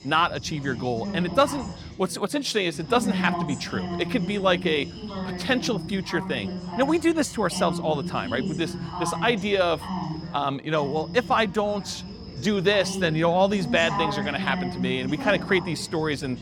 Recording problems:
background chatter; loud; throughout; 3 voices, 8 dB below the speech

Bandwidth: 18 kHz